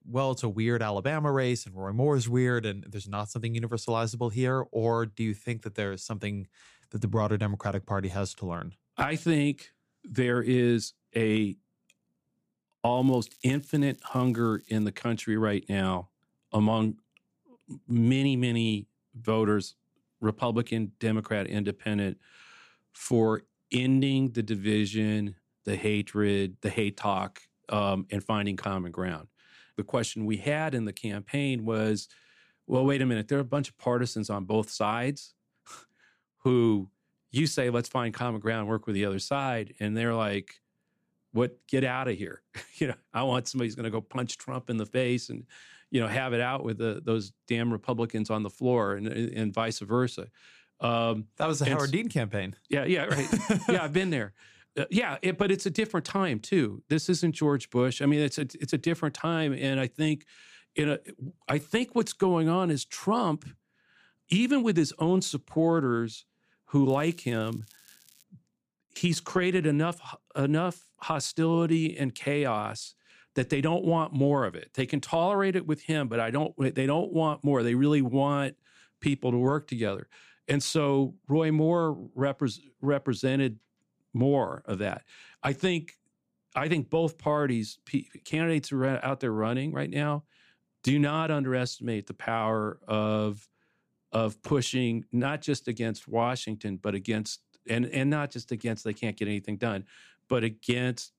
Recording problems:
crackling; faint; from 13 to 15 s and from 1:07 to 1:08; 25 dB below the speech

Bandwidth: 15 kHz